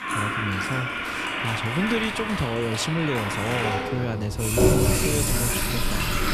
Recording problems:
household noises; very loud; throughout; 4 dB above the speech

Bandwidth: 14 kHz